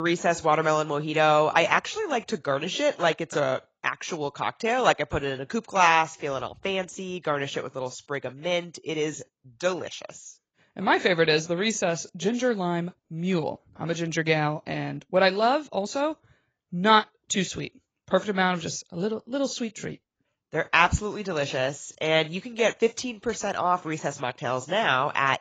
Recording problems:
garbled, watery; badly; nothing above 7.5 kHz
abrupt cut into speech; at the start

